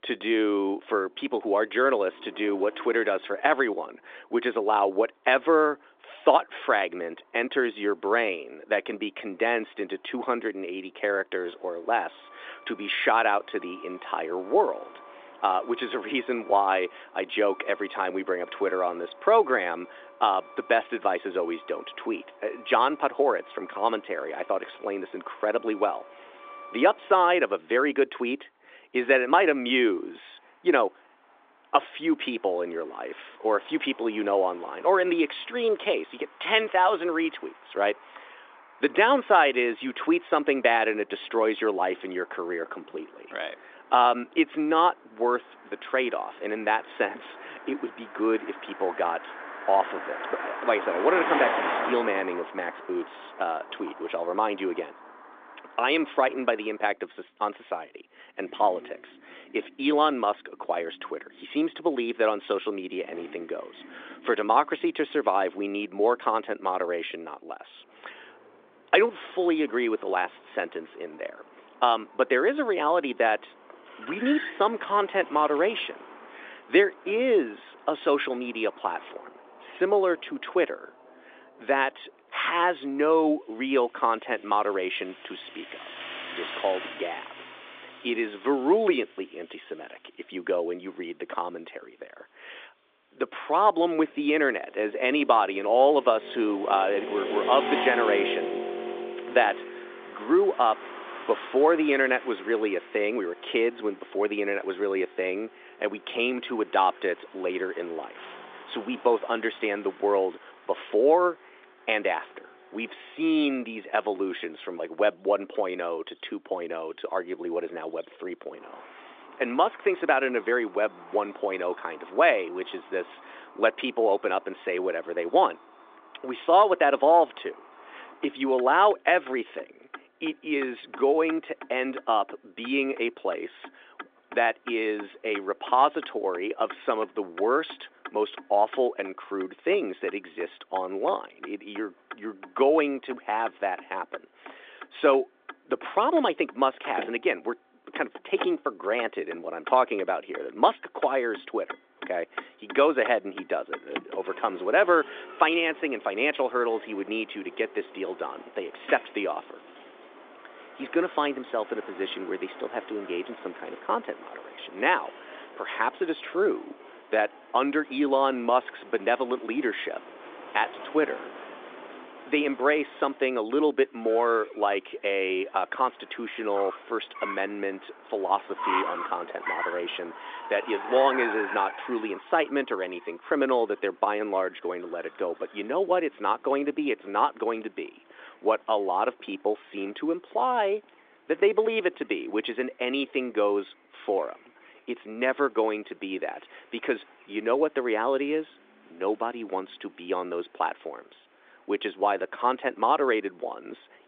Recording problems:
phone-call audio
traffic noise; noticeable; throughout; 15 dB below the speech

